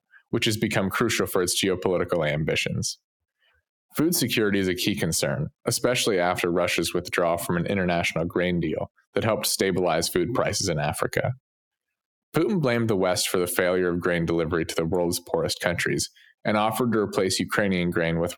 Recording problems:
squashed, flat; heavily

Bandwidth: 18.5 kHz